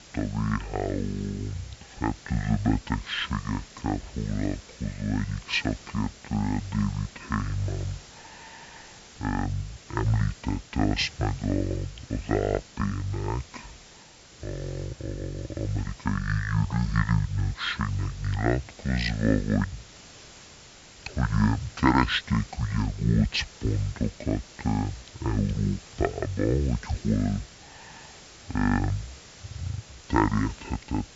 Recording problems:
wrong speed and pitch; too slow and too low; 0.6 times normal speed
high frequencies cut off; noticeable; nothing above 7.5 kHz
hiss; noticeable; throughout; 20 dB below the speech

